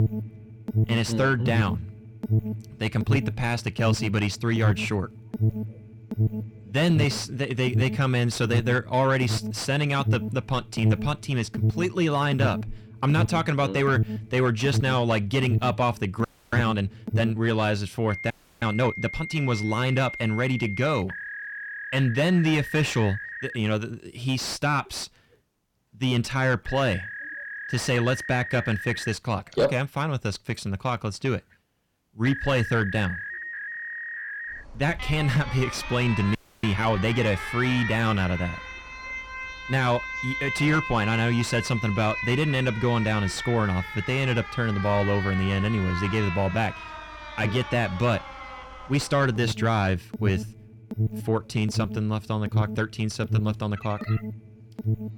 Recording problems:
distortion; slight; 10 dB below the speech
alarms or sirens; loud; throughout; 6 dB below the speech
audio freezing; at 16 s, at 18 s and at 36 s

